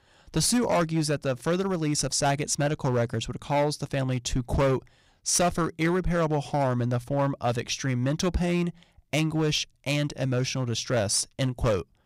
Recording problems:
distortion; slight; 7% of the sound clipped

